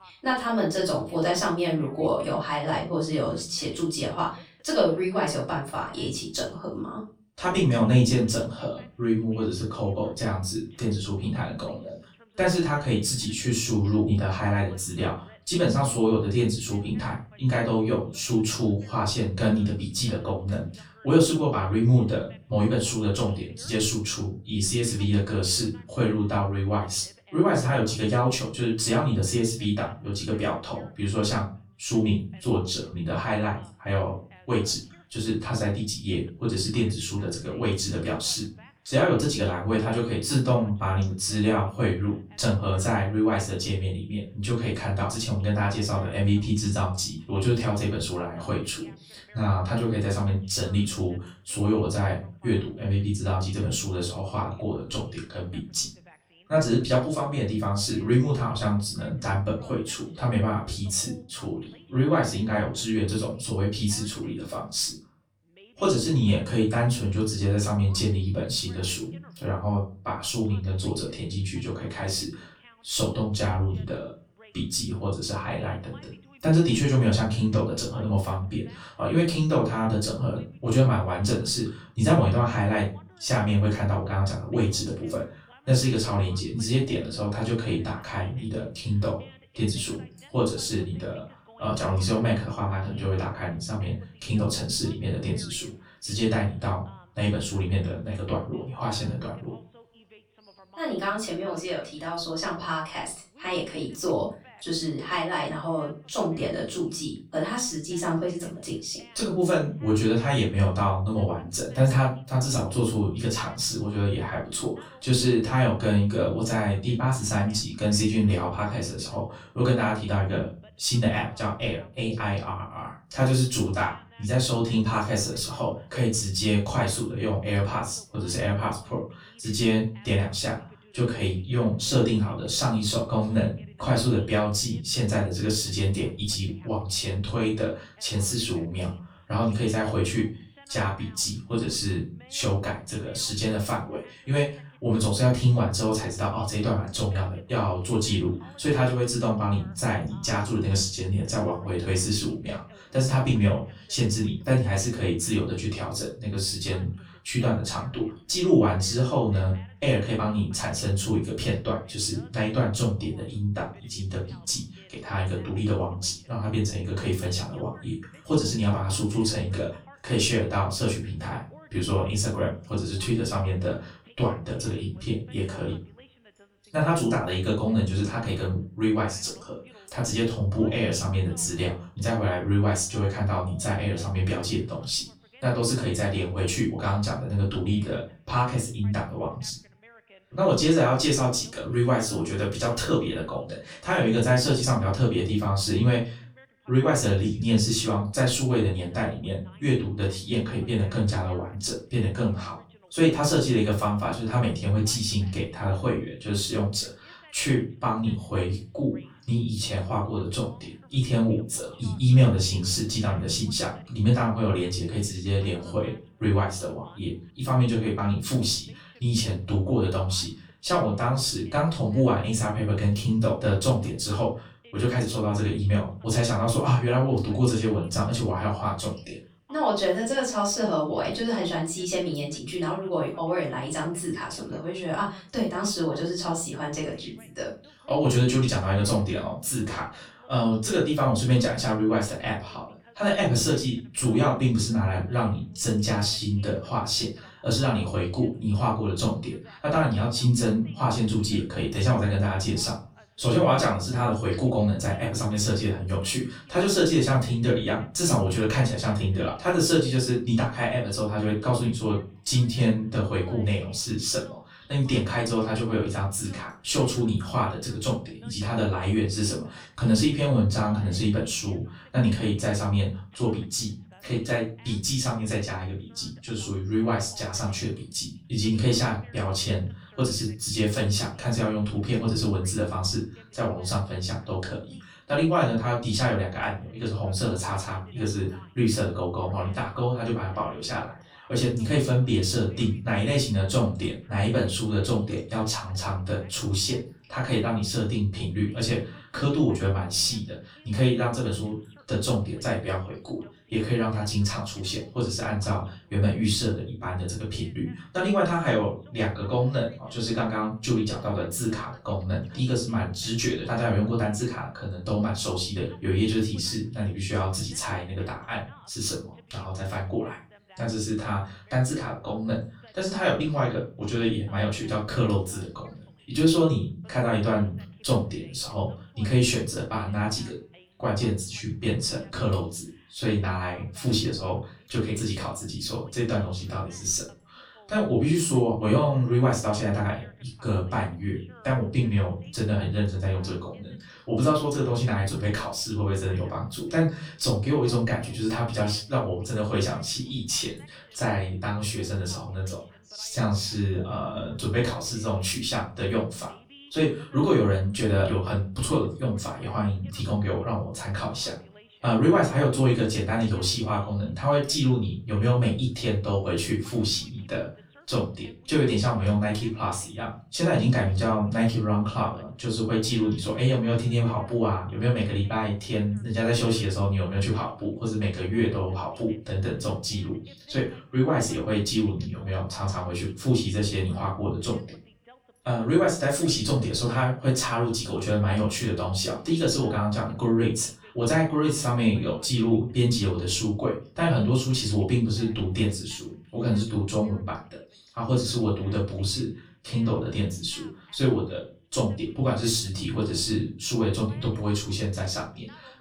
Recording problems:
off-mic speech; far
room echo; slight; dies away in 0.3 s
voice in the background; faint; throughout; 30 dB below the speech

